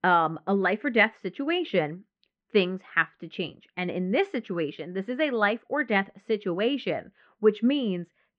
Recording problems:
muffled; very; fading above 2.5 kHz

